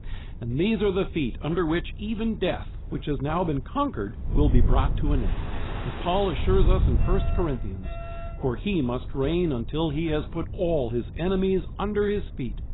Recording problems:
garbled, watery; badly; nothing above 4 kHz
rain or running water; noticeable; throughout; 15 dB below the speech
wind noise on the microphone; occasional gusts; 20 dB below the speech
alarm; faint; from 7 to 8.5 s; peak 15 dB below the speech

